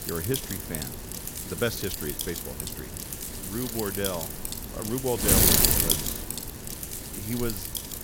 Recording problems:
wind noise on the microphone; heavy; 4 dB above the speech
hiss; faint; throughout; 25 dB below the speech

